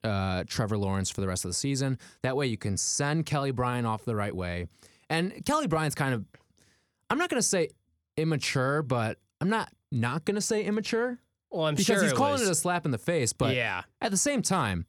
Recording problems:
none

